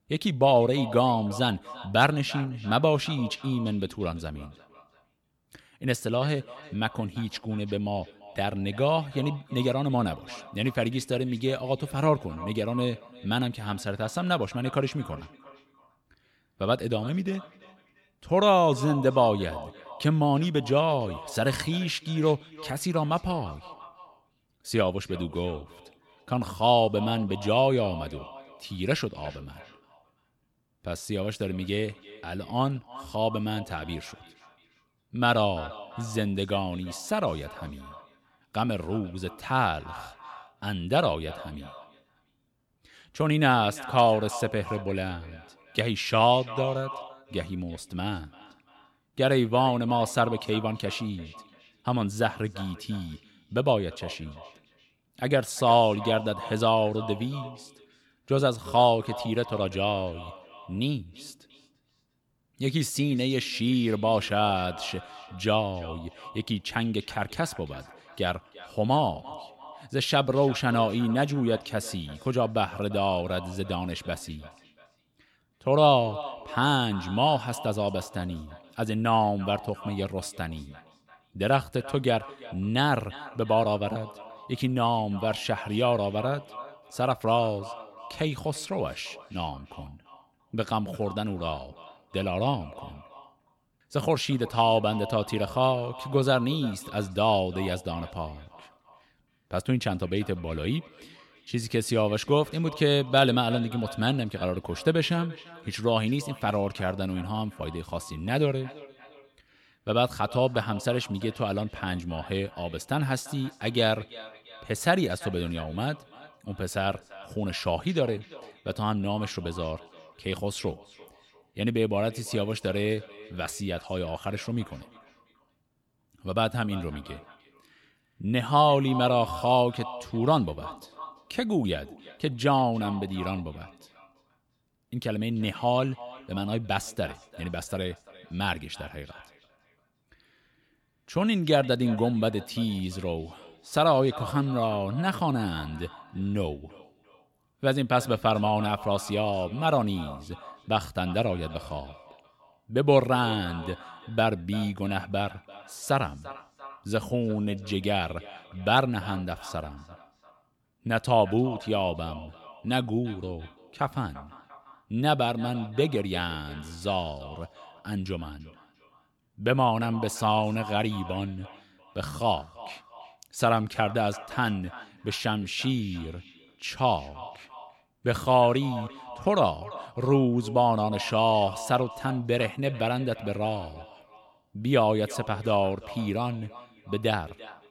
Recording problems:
echo of what is said; noticeable; throughout; 340 ms later, 15 dB below the speech

